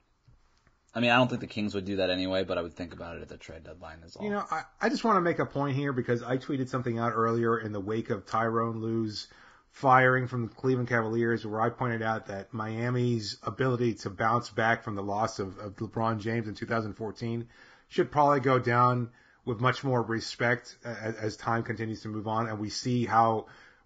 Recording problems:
garbled, watery; badly; nothing above 7.5 kHz

